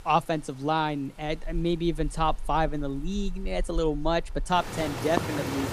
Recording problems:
rain or running water; loud; throughout; 9 dB below the speech

